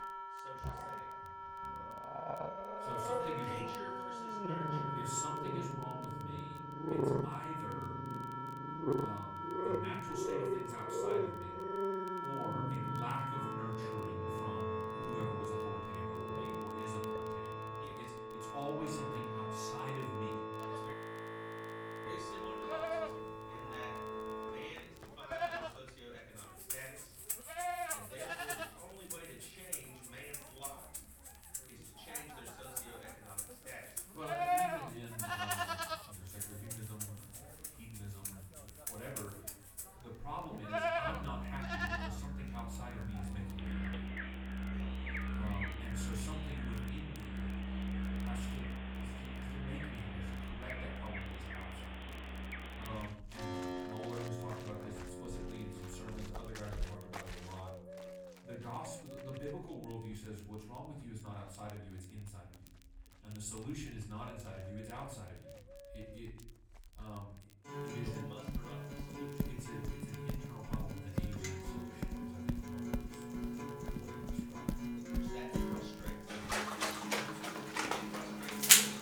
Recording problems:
off-mic speech; far
room echo; slight; dies away in 0.6 s
animal sounds; very loud; throughout; 8 dB above the speech
background music; very loud; throughout; 4 dB above the speech
crackle, like an old record; noticeable; 20 dB below the speech
audio freezing; at 21 s for 1 s

